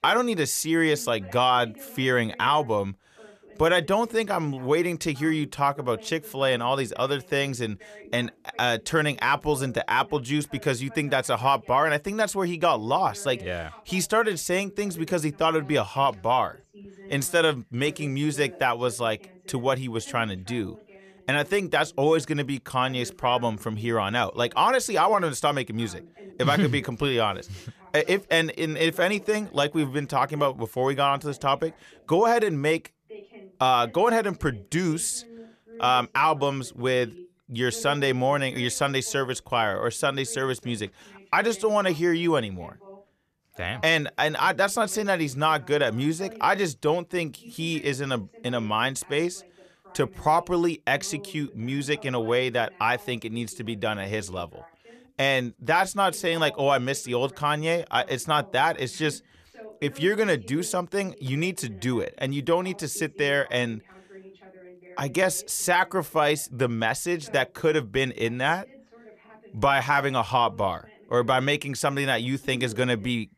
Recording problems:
voice in the background; faint; throughout; 25 dB below the speech

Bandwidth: 14.5 kHz